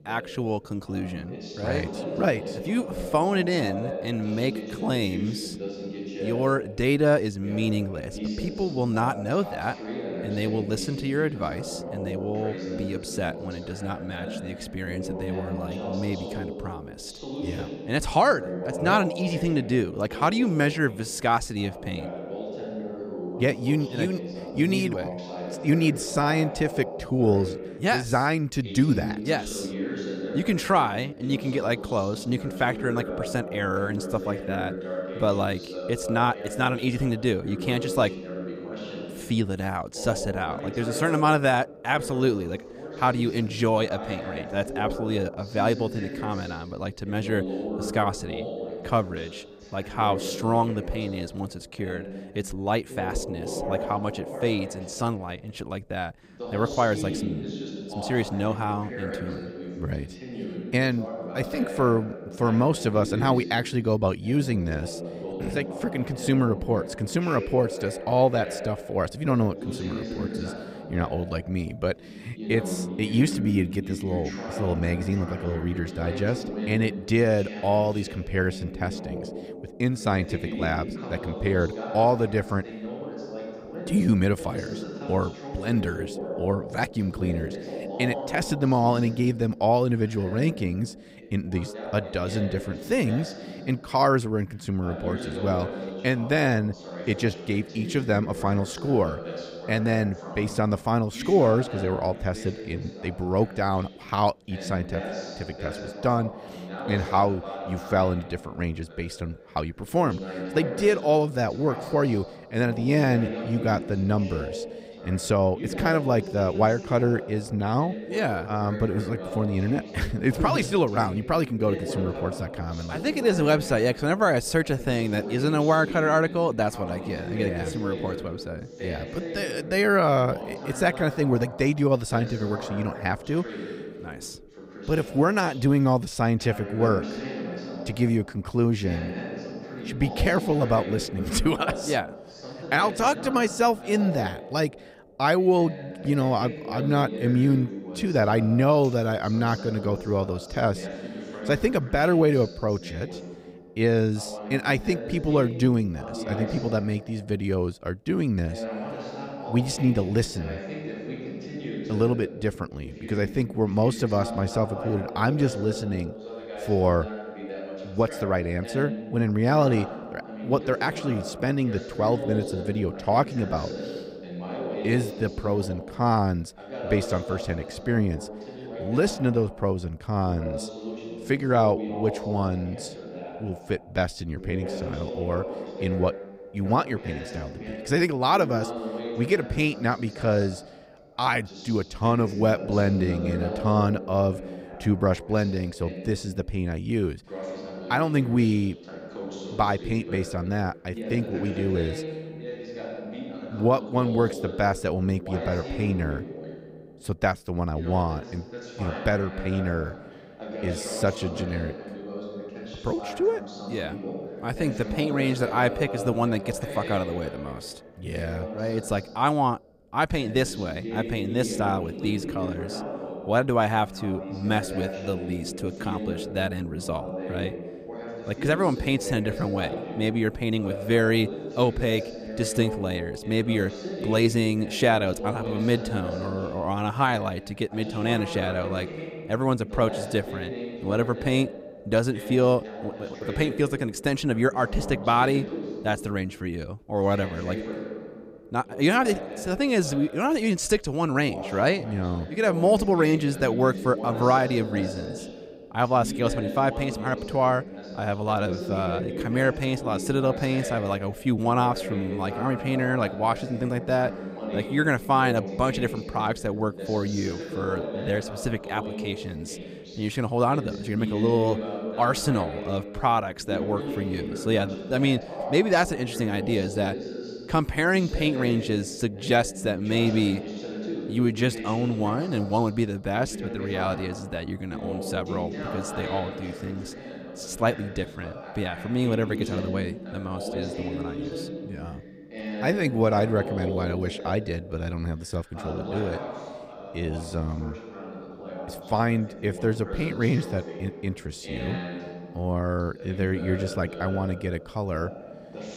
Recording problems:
voice in the background; loud; throughout; 9 dB below the speech

